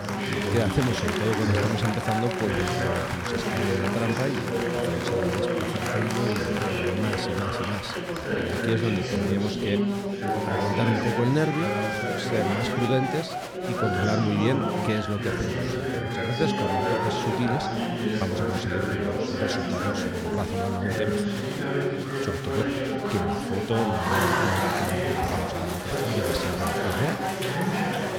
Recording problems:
chatter from many people; very loud; throughout; 3 dB above the speech

